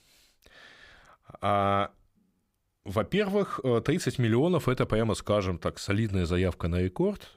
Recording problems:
none

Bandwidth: 15.5 kHz